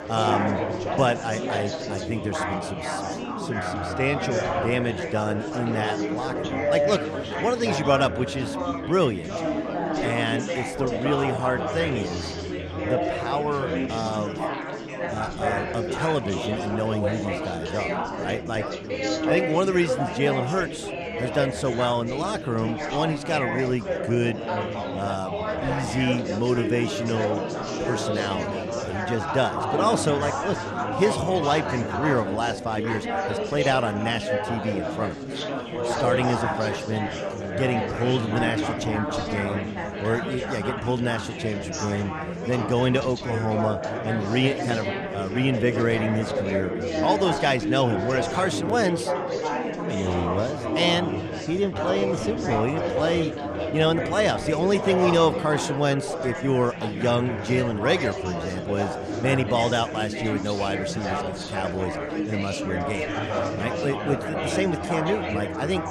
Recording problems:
chatter from many people; loud; throughout; 2 dB below the speech

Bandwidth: 13.5 kHz